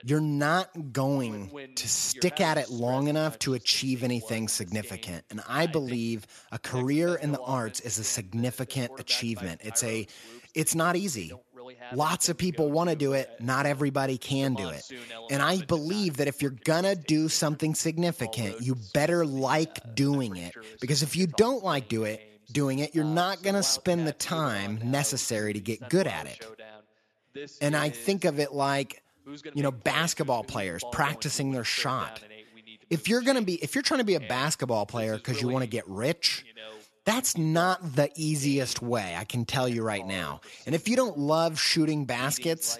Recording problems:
voice in the background; noticeable; throughout; 20 dB below the speech

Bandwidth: 13.5 kHz